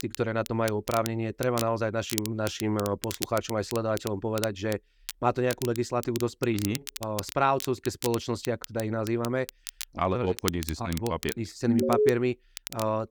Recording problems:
crackle, like an old record; noticeable; 10 dB below the speech
alarm; loud; at 12 s; peak 5 dB above the speech

